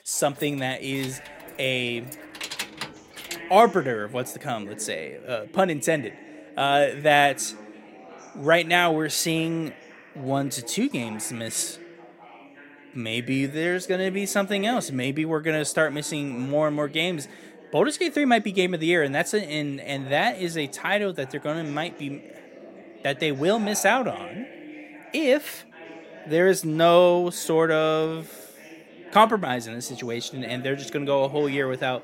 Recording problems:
background chatter; noticeable; throughout; 4 voices, 20 dB below the speech
jangling keys; noticeable; until 3.5 s; peak 8 dB below the speech

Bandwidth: 16 kHz